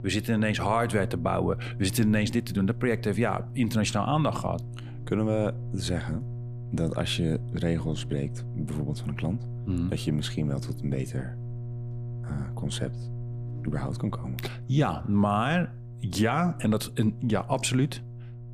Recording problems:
electrical hum; noticeable; throughout; 60 Hz, 20 dB below the speech

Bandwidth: 15 kHz